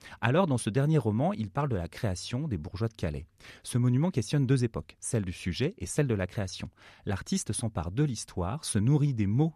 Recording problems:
none

